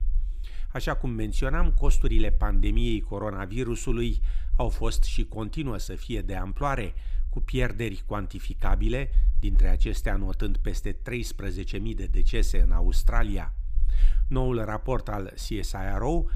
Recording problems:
low rumble; faint; throughout; 25 dB below the speech

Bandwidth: 15 kHz